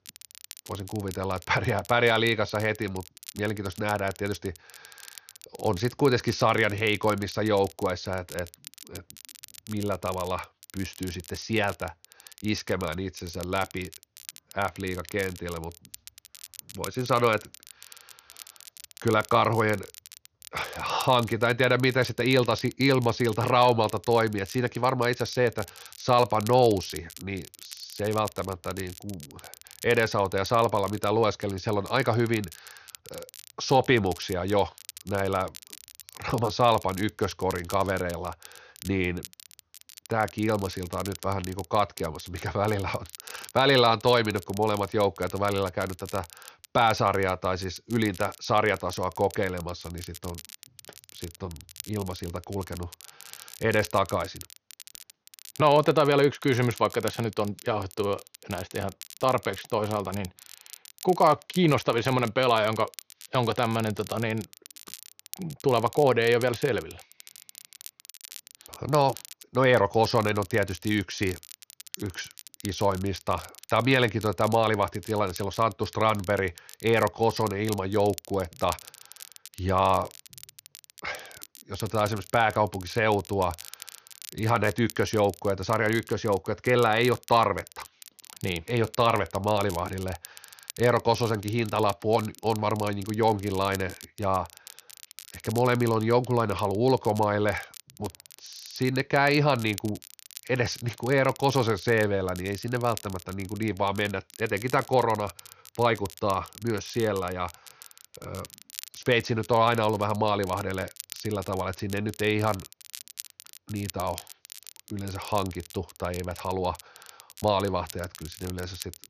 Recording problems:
high frequencies cut off; noticeable; nothing above 6.5 kHz
crackle, like an old record; noticeable; 20 dB below the speech

